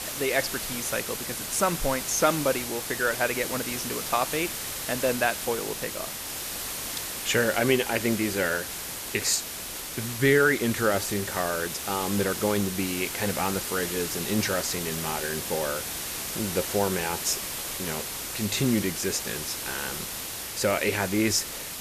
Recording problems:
hiss; loud; throughout; 4 dB below the speech

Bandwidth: 14.5 kHz